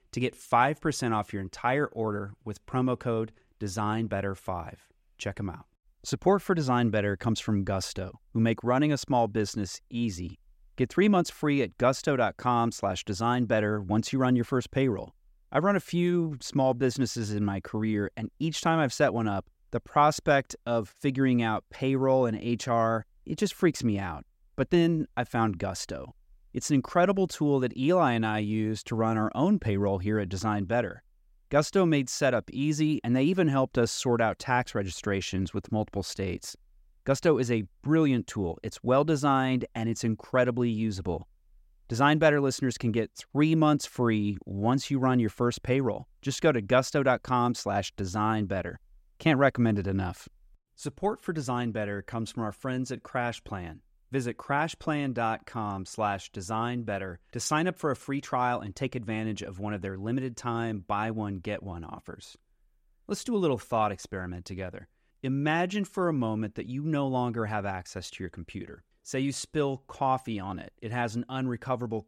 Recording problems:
none

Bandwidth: 16 kHz